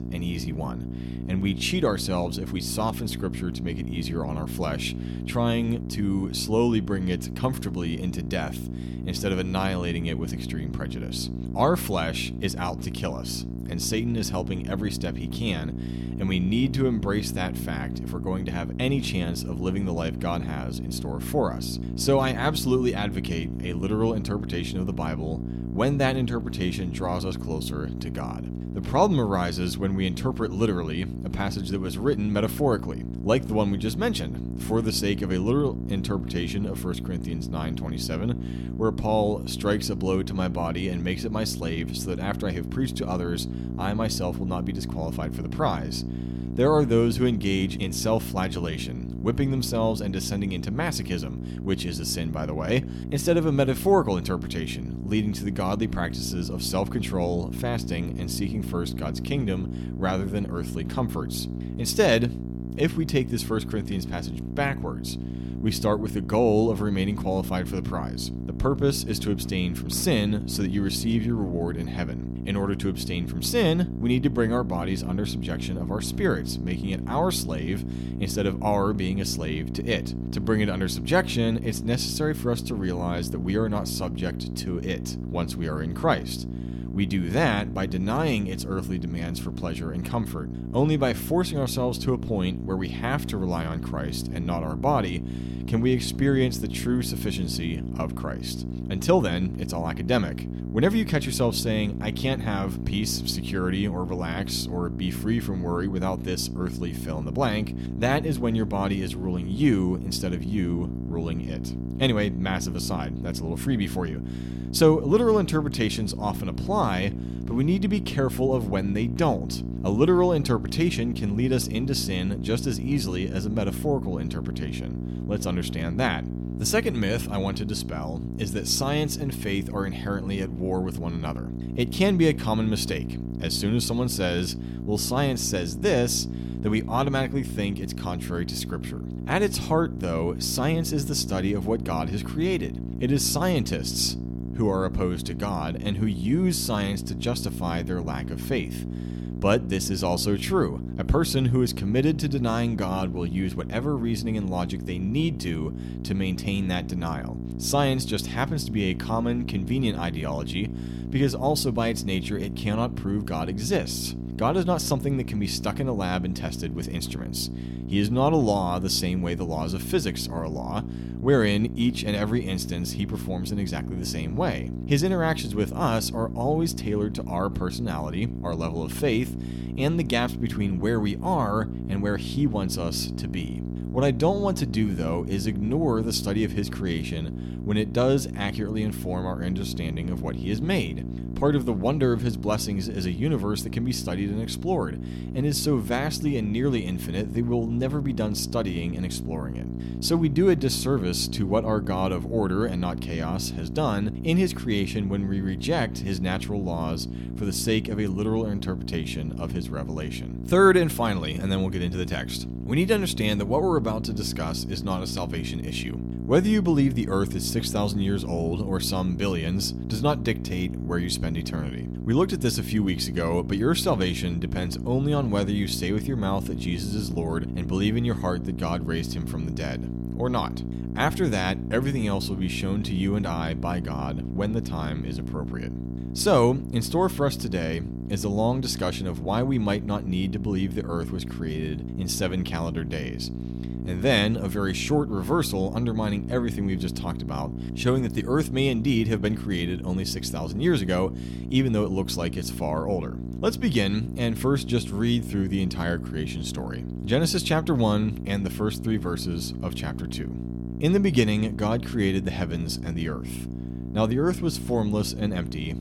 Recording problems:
electrical hum; noticeable; throughout; 60 Hz, 10 dB below the speech

